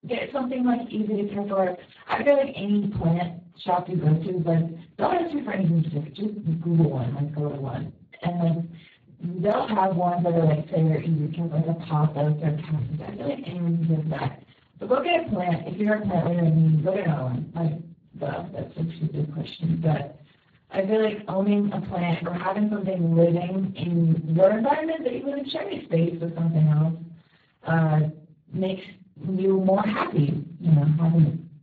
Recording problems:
off-mic speech; far
garbled, watery; badly
room echo; slight; dies away in 0.3 s

